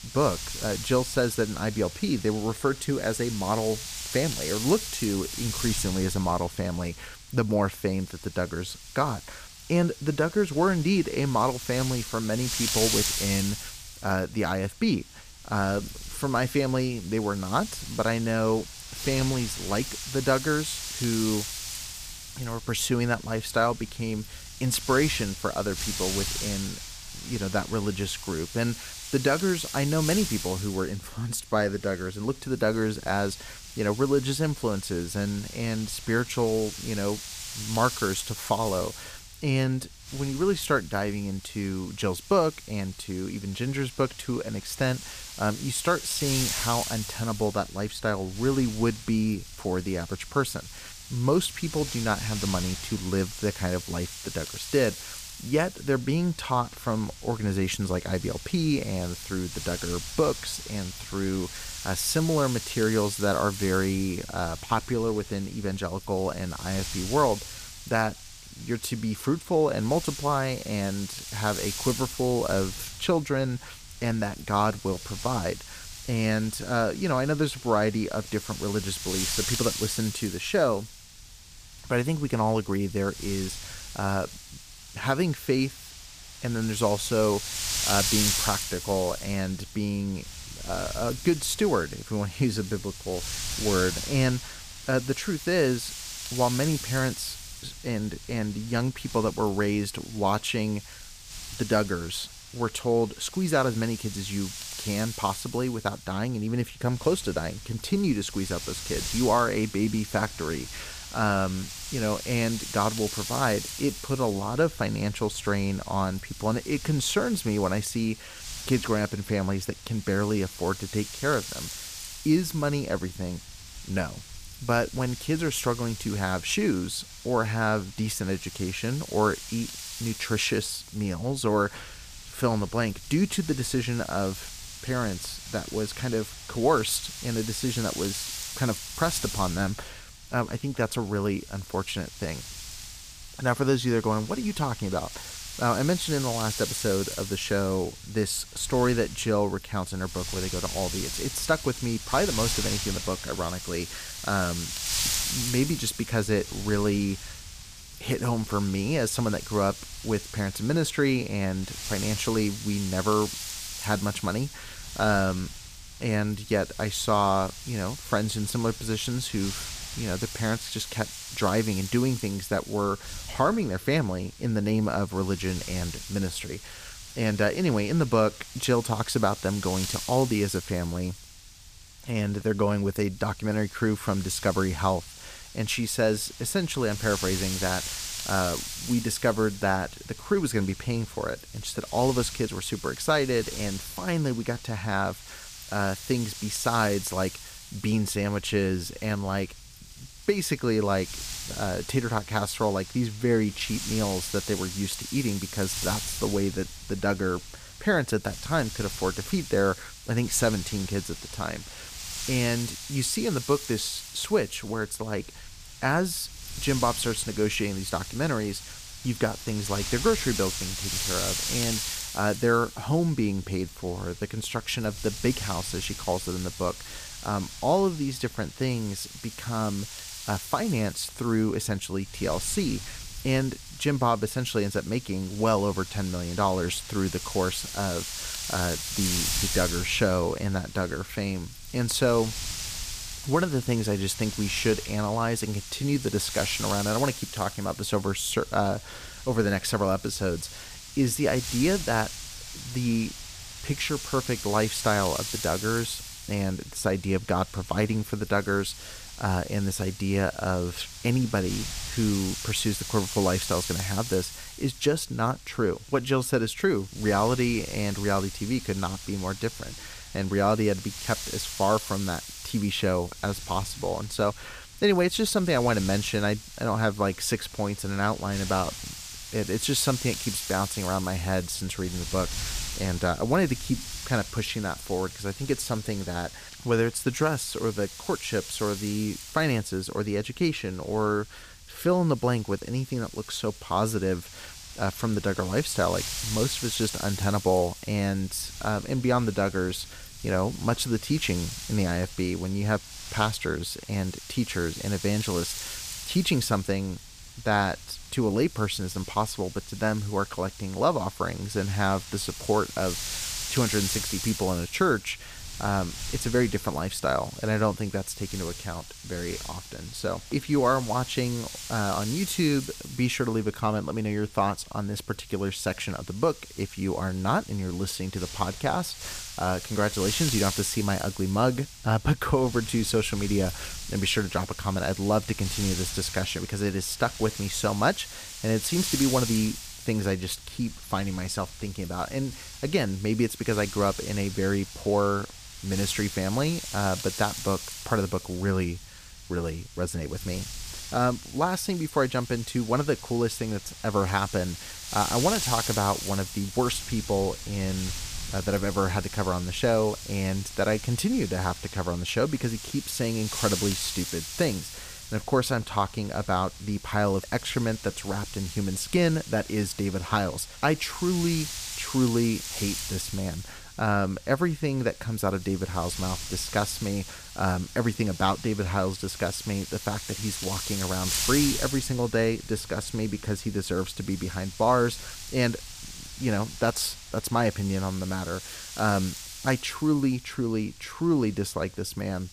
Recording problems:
wind noise on the microphone; heavy; 8 dB below the speech

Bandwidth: 15 kHz